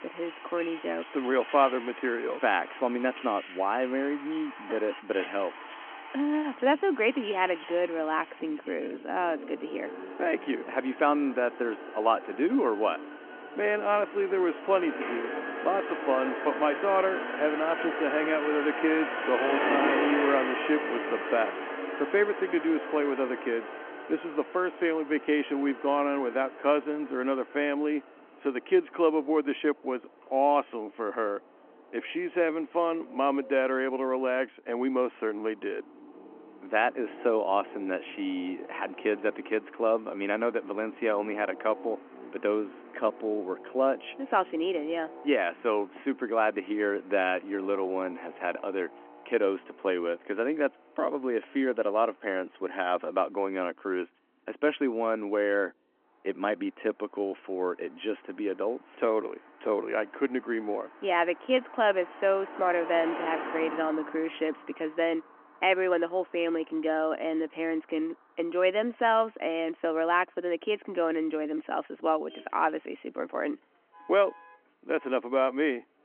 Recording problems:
phone-call audio
traffic noise; loud; throughout; 8 dB below the speech

